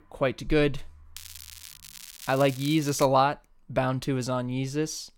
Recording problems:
crackling; noticeable; from 1 to 3 s; 15 dB below the speech

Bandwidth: 16.5 kHz